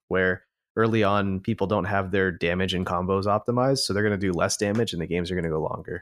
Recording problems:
none

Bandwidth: 15.5 kHz